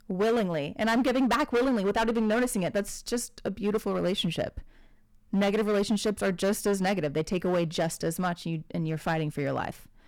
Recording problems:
distortion; heavy; 11% of the sound clipped

